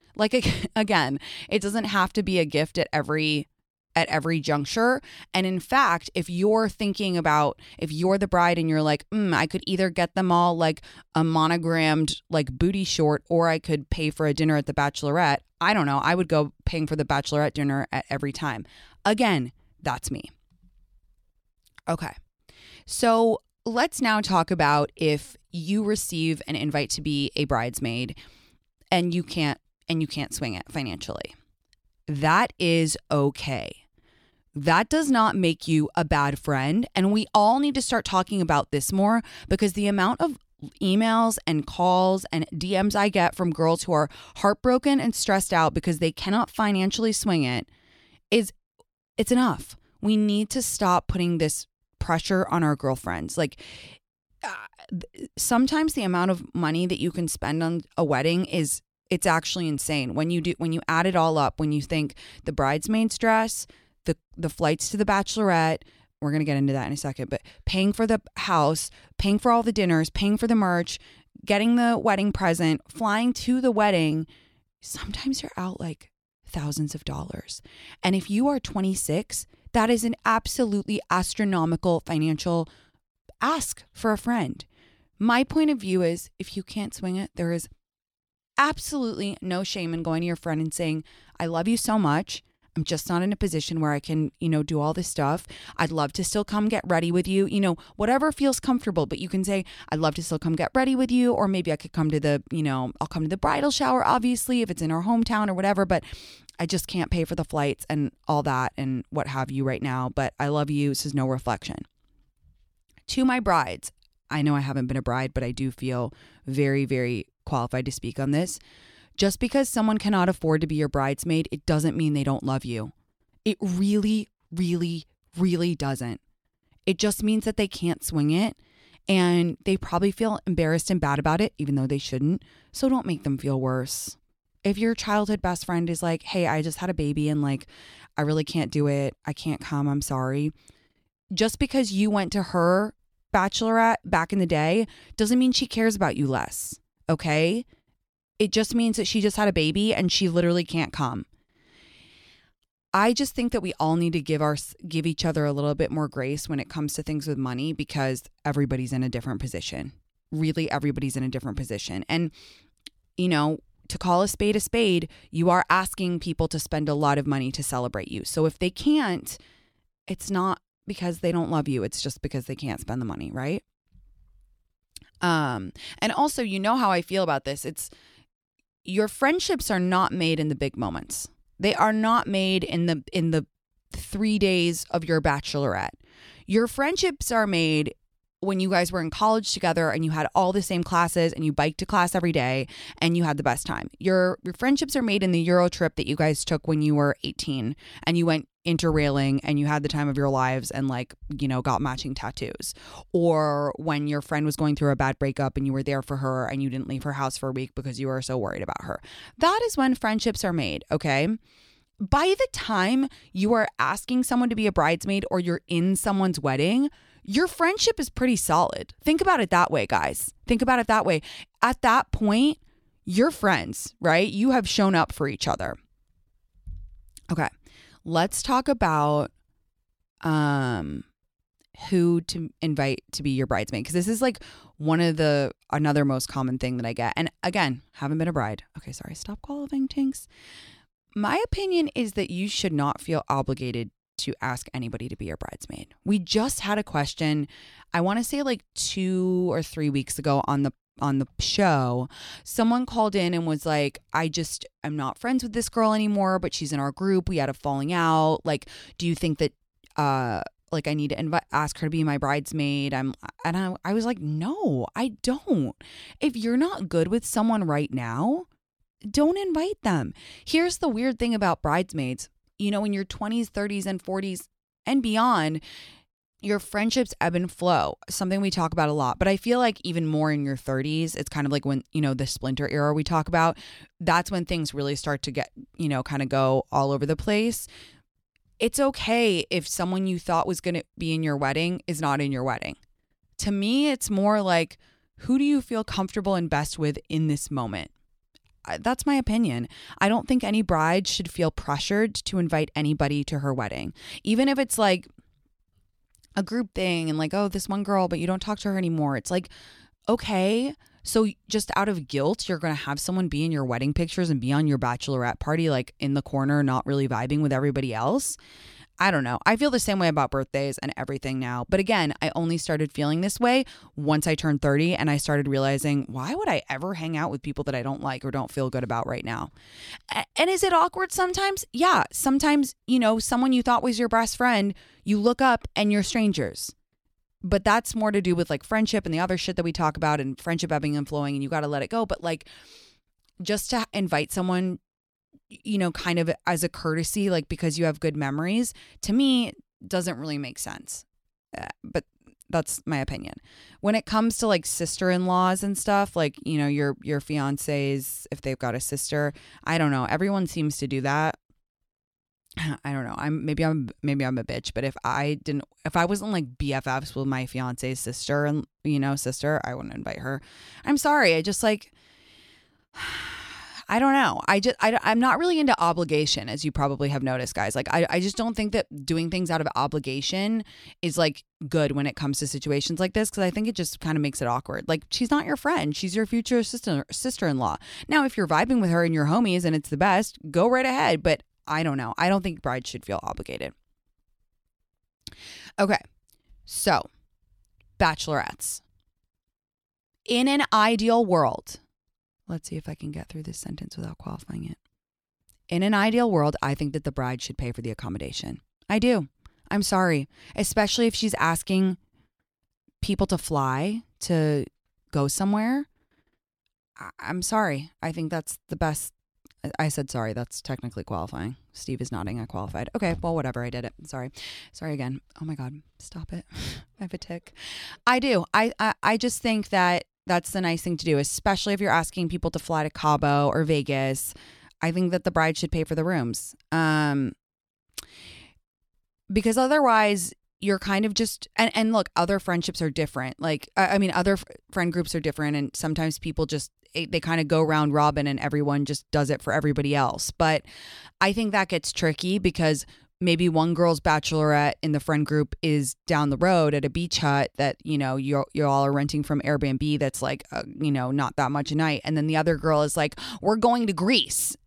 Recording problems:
none

